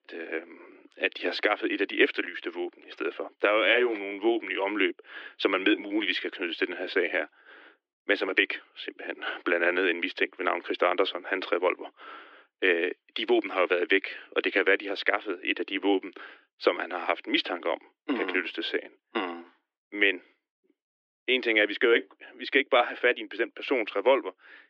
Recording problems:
muffled; slightly; fading above 2.5 kHz
thin; somewhat; fading below 300 Hz

